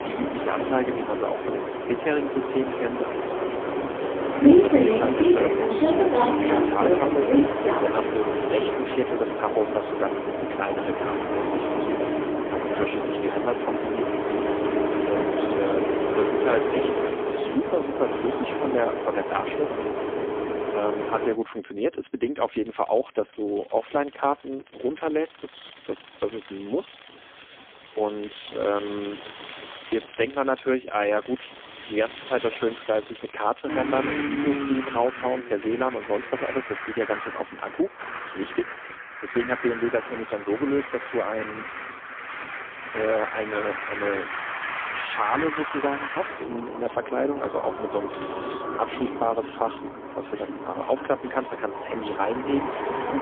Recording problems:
phone-call audio; poor line; nothing above 3.5 kHz
traffic noise; very loud; throughout; 1 dB above the speech

